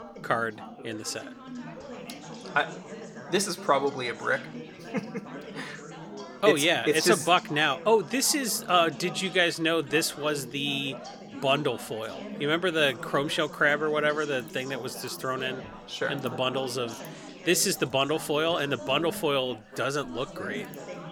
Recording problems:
background chatter; noticeable; throughout; 4 voices, 15 dB below the speech

